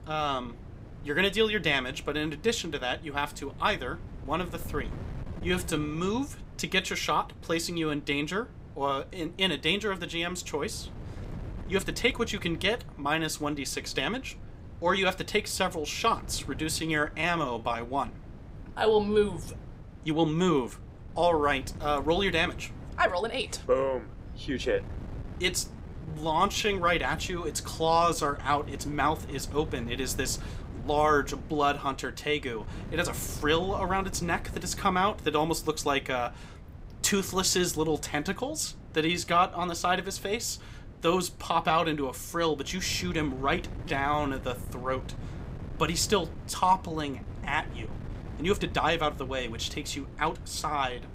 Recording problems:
wind noise on the microphone; occasional gusts; 20 dB below the speech
uneven, jittery; strongly; from 5.5 to 51 s

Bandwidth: 15.5 kHz